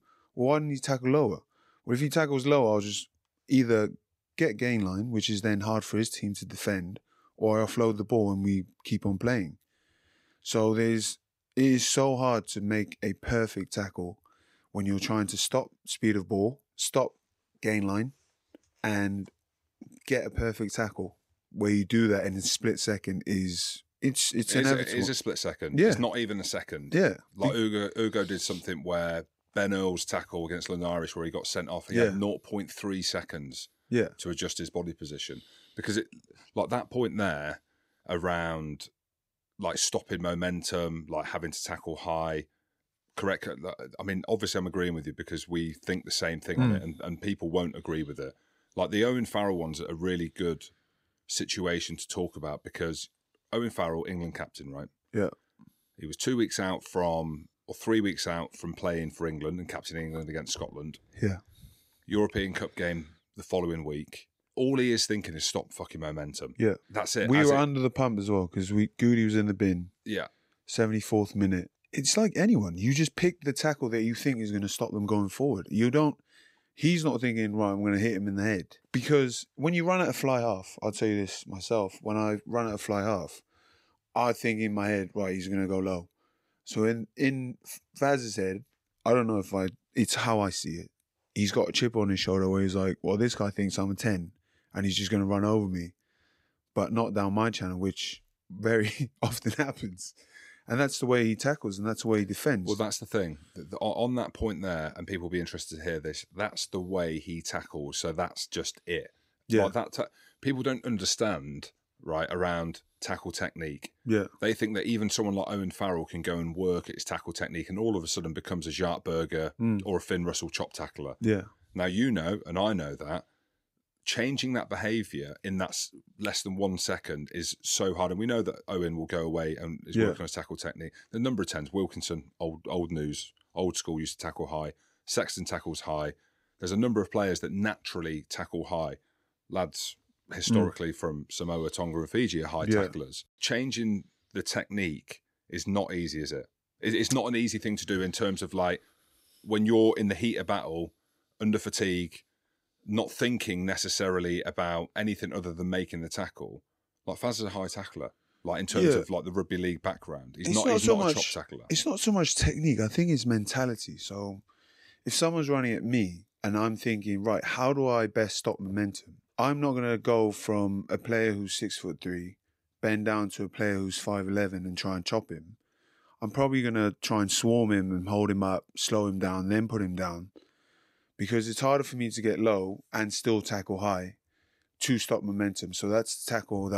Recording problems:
abrupt cut into speech; at the end

